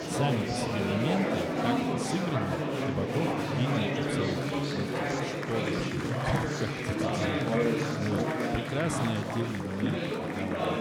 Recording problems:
chatter from many people; very loud; throughout; 5 dB above the speech

